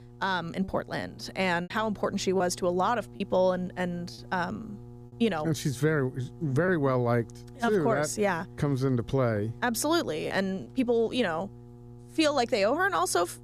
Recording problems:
electrical hum; faint; throughout; 60 Hz, 25 dB below the speech
choppy; occasionally; 2% of the speech affected

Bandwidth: 14.5 kHz